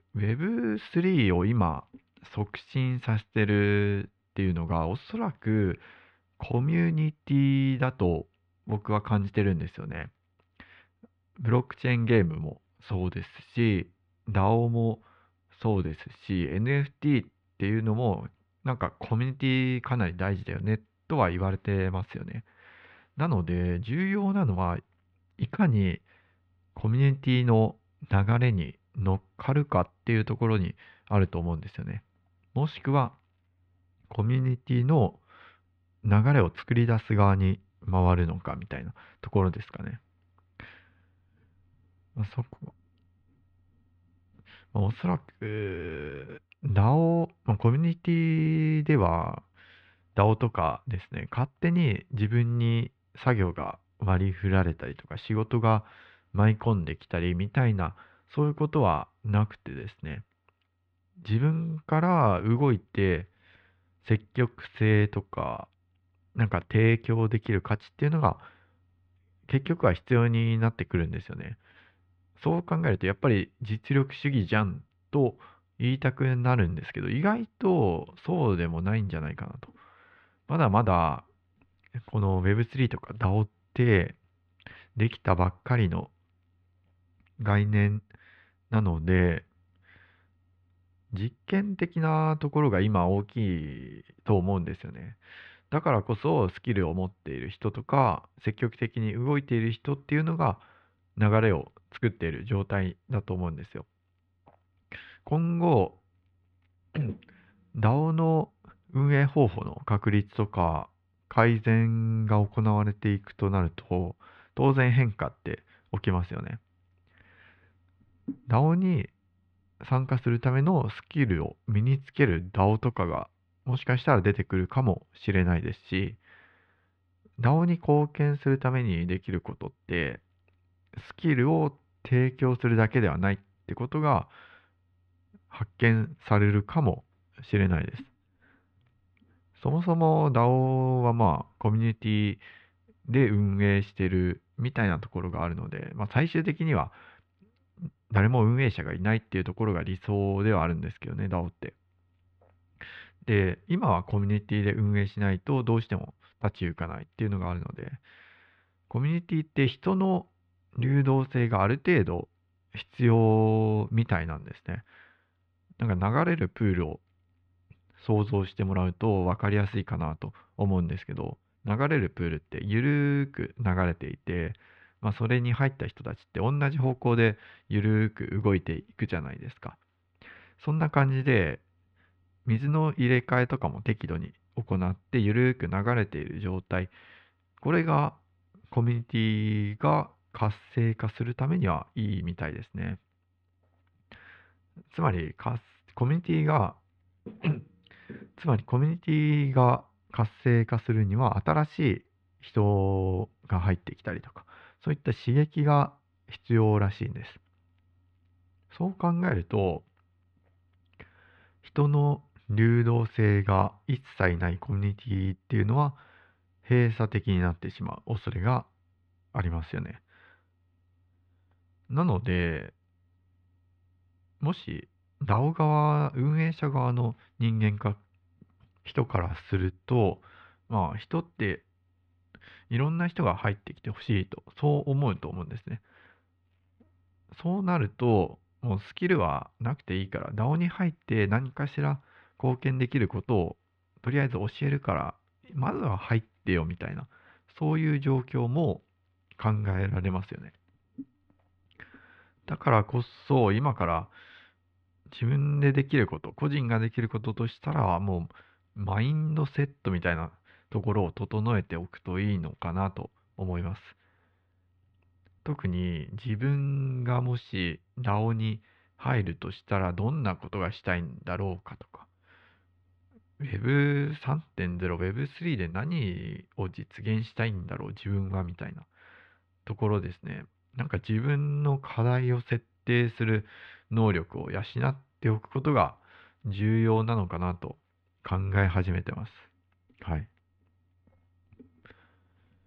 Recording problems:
muffled; very; fading above 3 kHz

